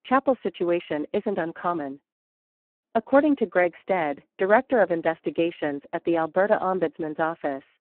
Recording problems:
phone-call audio; poor line

